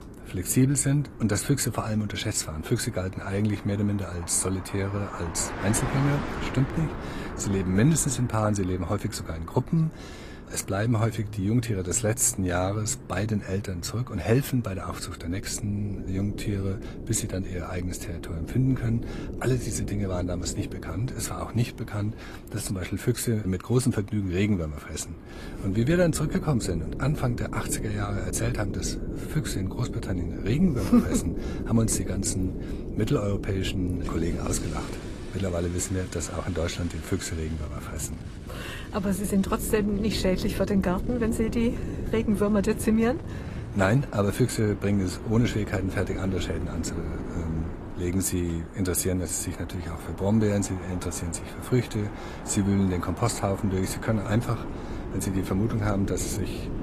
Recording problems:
garbled, watery; slightly; nothing above 14.5 kHz
traffic noise; noticeable; throughout; 15 dB below the speech
wind noise on the microphone; occasional gusts; 10 dB below the speech

